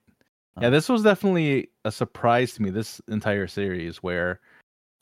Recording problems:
none

